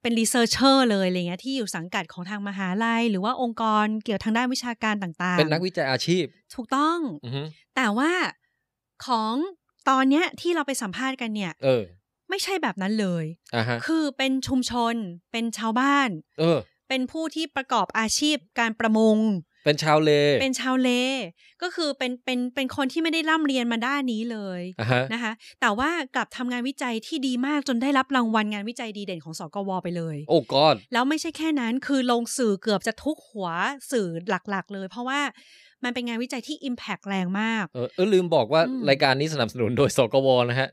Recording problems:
none

